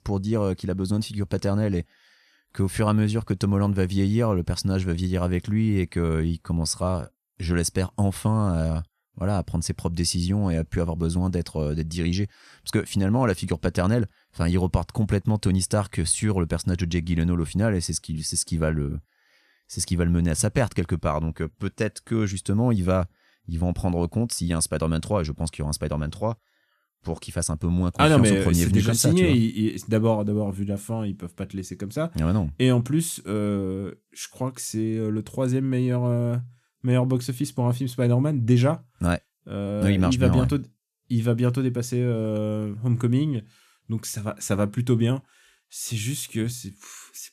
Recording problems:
none

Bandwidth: 14.5 kHz